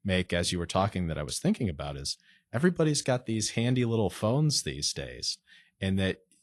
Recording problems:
garbled, watery; slightly; nothing above 11 kHz

